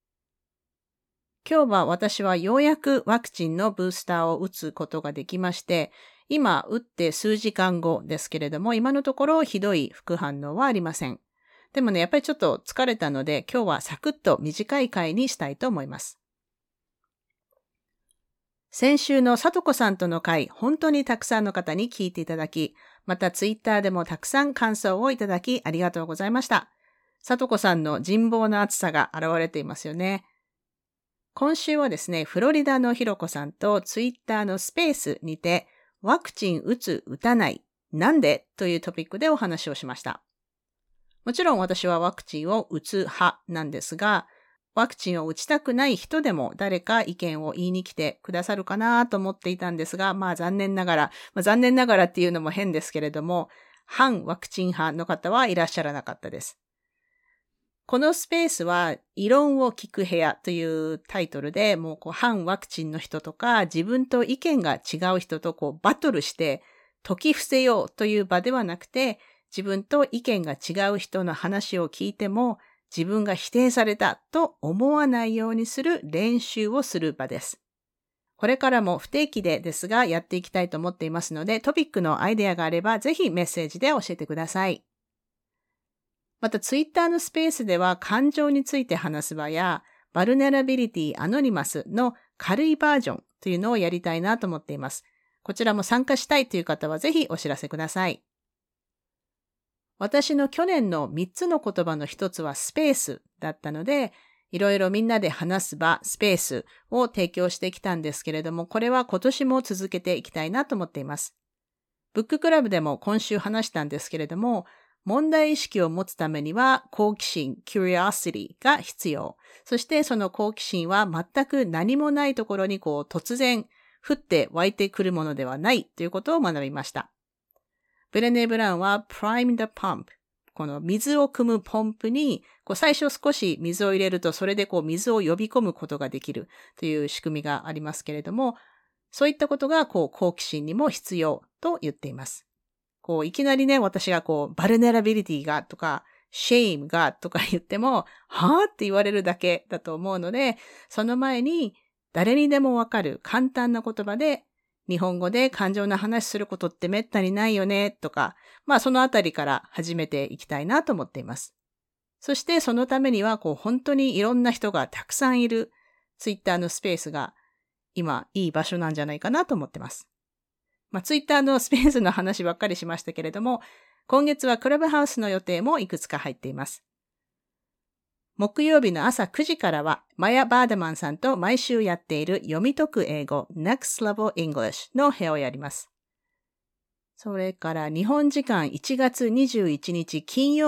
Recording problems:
abrupt cut into speech; at the end

